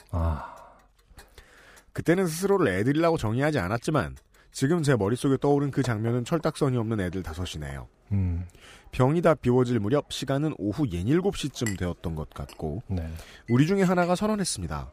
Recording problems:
household noises; faint; throughout; 20 dB below the speech

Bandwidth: 15 kHz